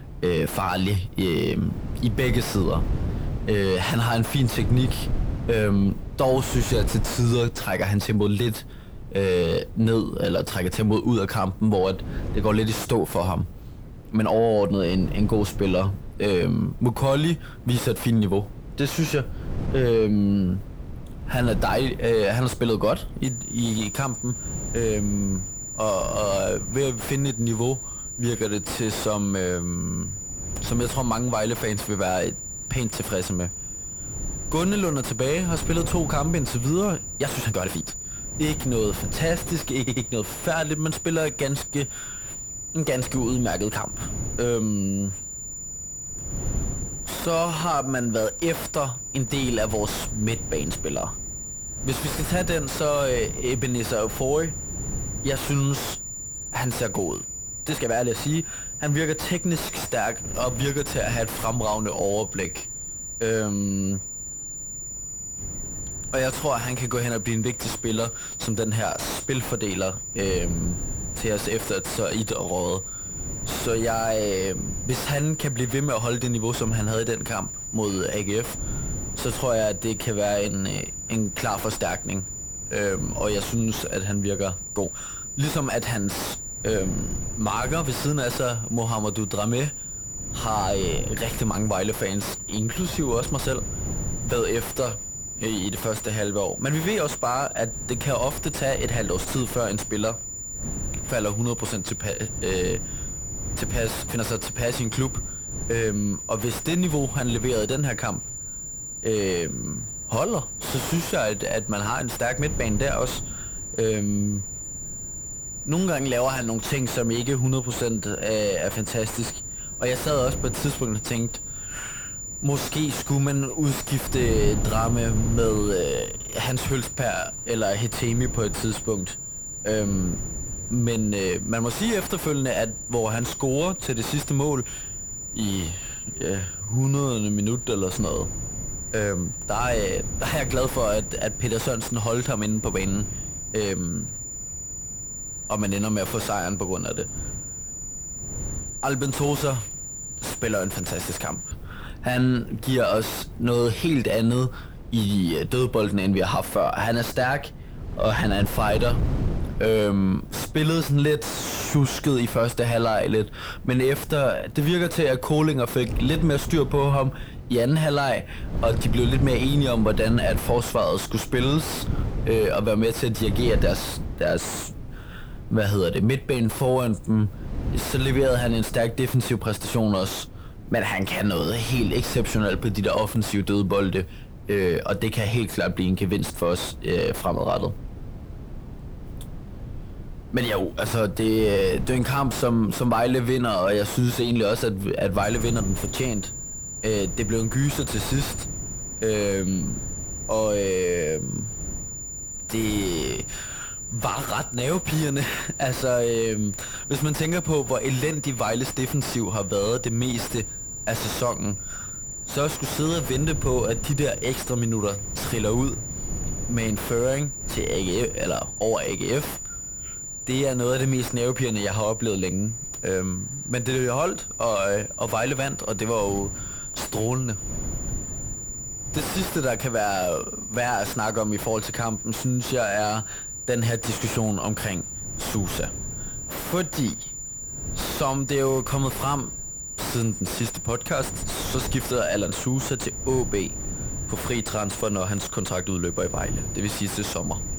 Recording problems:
distortion; heavy; 6 dB below the speech
high-pitched whine; loud; from 23 s to 2:32 and from 3:15 on; 7 kHz, 7 dB below the speech
wind noise on the microphone; occasional gusts; 20 dB below the speech
uneven, jittery; strongly; from 18 s to 3:32
audio stuttering; at 30 s and at 40 s

